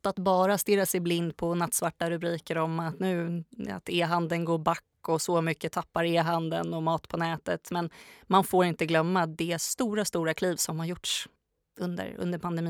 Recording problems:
abrupt cut into speech; at the end

